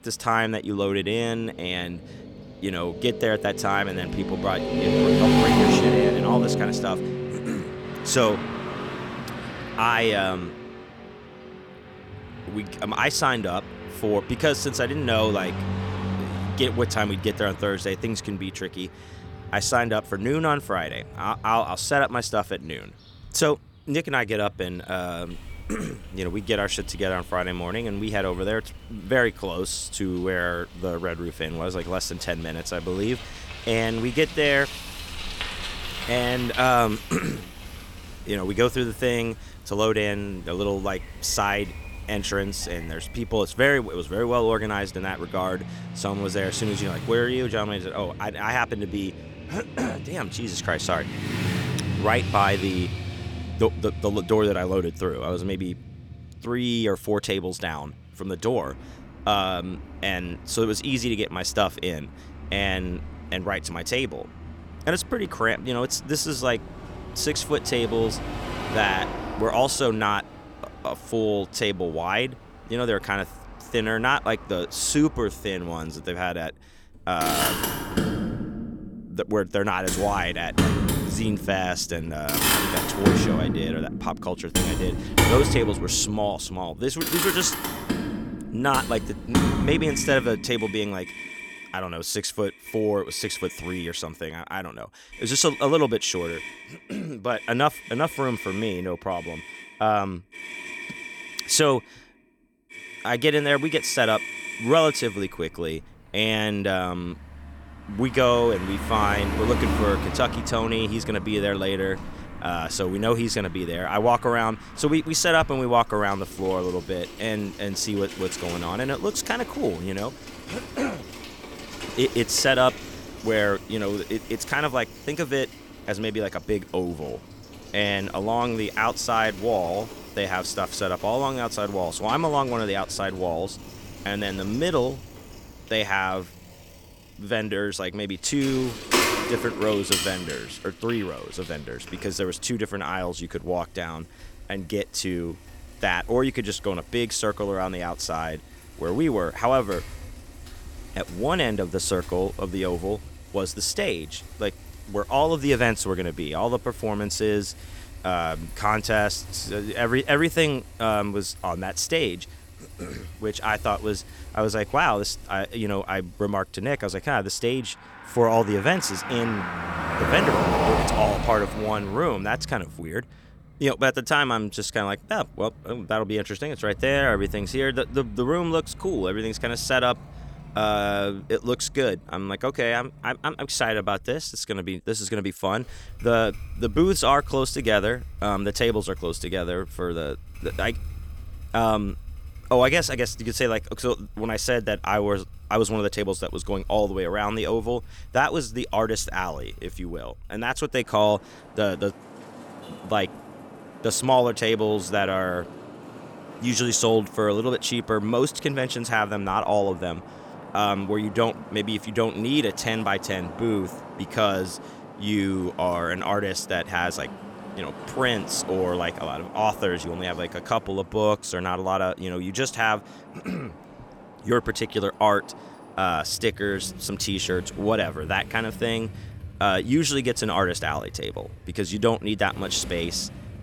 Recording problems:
traffic noise; loud; throughout; 7 dB below the speech

